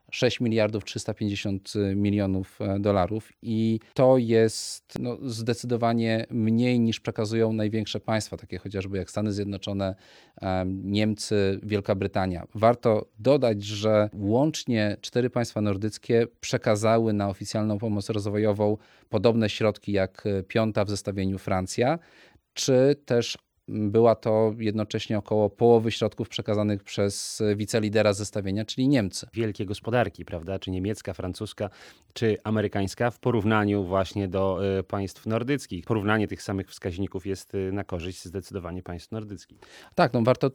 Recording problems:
none

